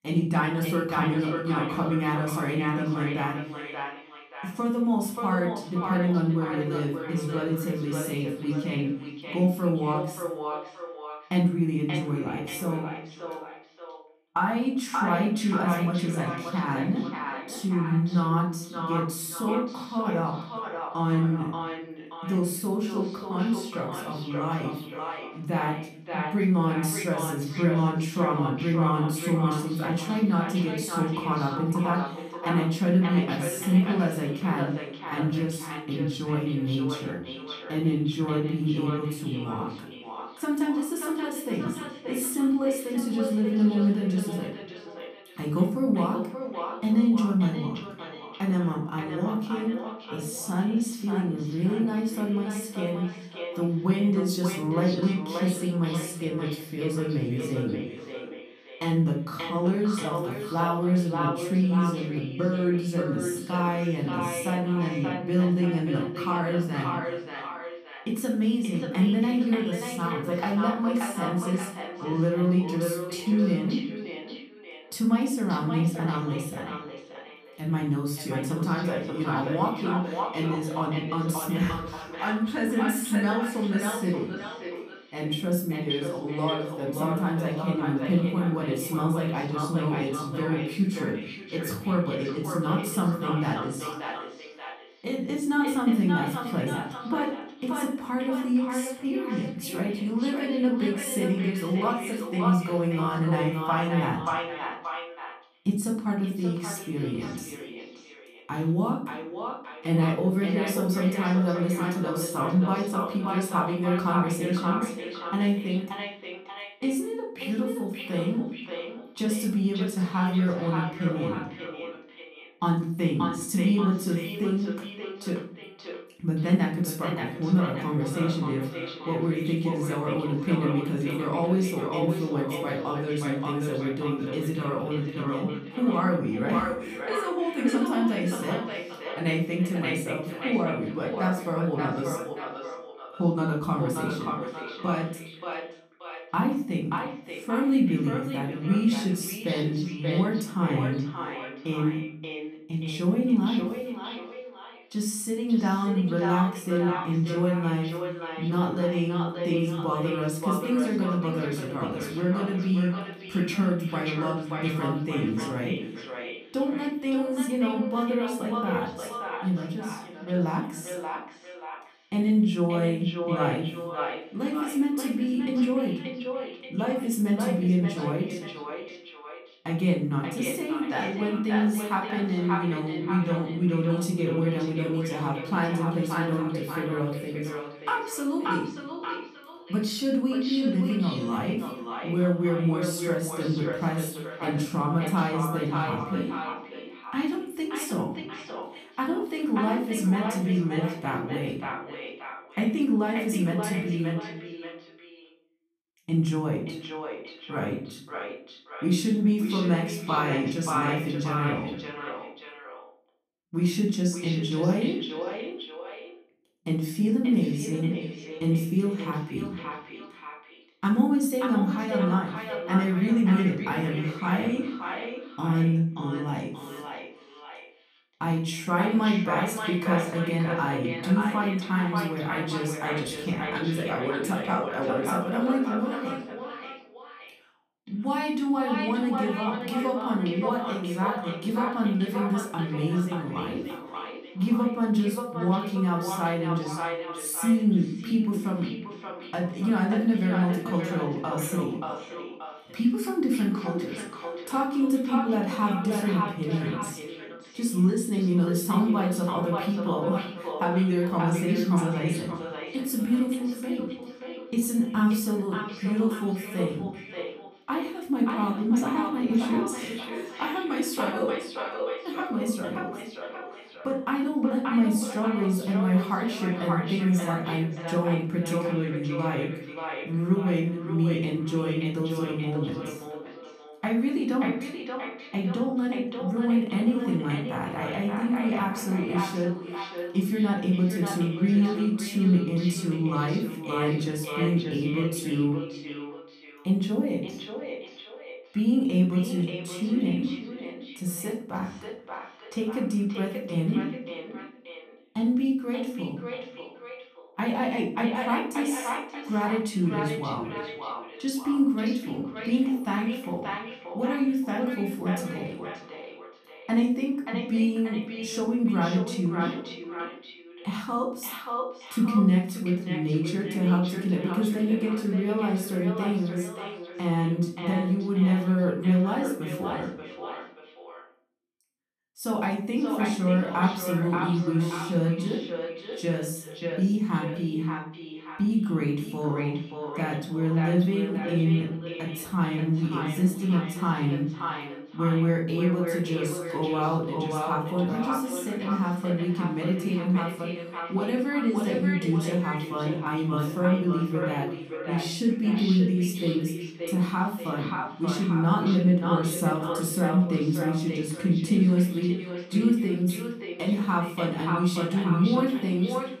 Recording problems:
echo of what is said; strong; throughout; 580 ms later, 9 dB below the speech
off-mic speech; far
room echo; slight; dies away in 0.5 s

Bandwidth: 14.5 kHz